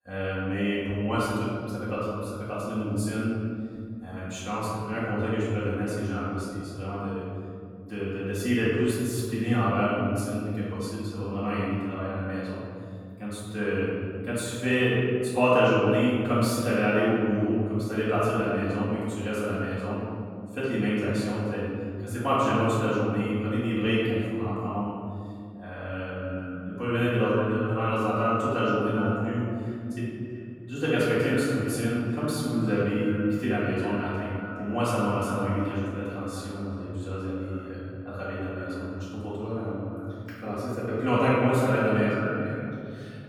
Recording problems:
room echo; strong; dies away in 2.4 s
off-mic speech; far
echo of what is said; noticeable; from 26 s on; 380 ms later, 10 dB below the speech

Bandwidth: 18.5 kHz